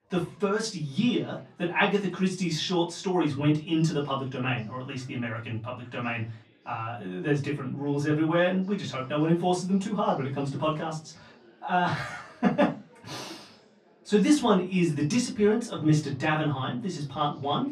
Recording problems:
off-mic speech; far
room echo; very slight; dies away in 0.3 s
chatter from many people; faint; throughout; 30 dB below the speech

